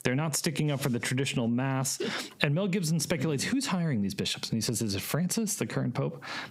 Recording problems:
squashed, flat; heavily

